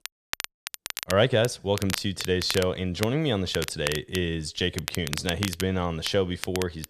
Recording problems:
crackle, like an old record; loud; 8 dB below the speech

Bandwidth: 13.5 kHz